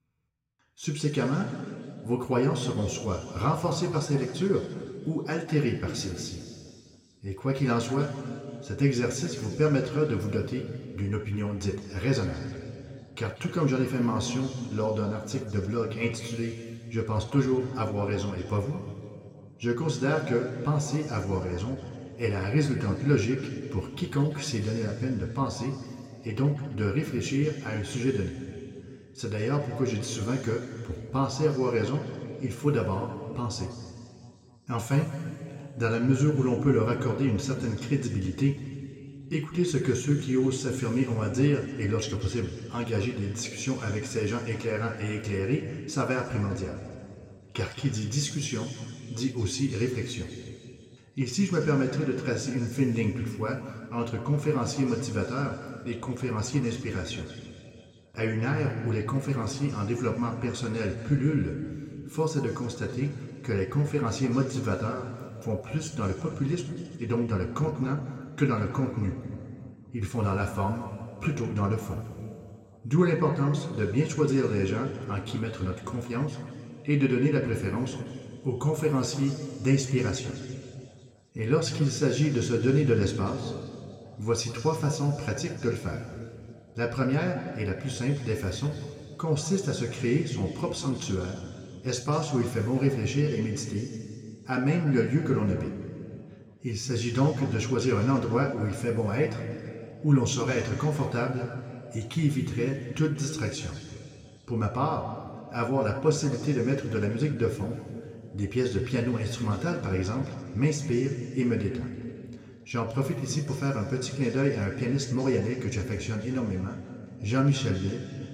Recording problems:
room echo; noticeable; dies away in 2.4 s
off-mic speech; somewhat distant

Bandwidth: 16 kHz